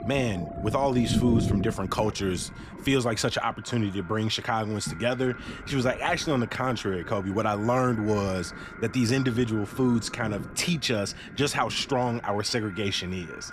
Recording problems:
echo of what is said; faint; throughout; 570 ms later, 20 dB below the speech
rain or running water; loud; throughout; 10 dB below the speech

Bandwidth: 14.5 kHz